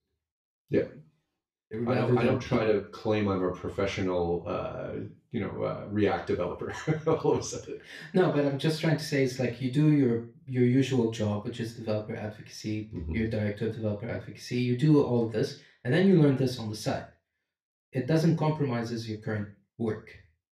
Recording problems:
off-mic speech; far
room echo; slight; dies away in 0.3 s

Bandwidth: 14.5 kHz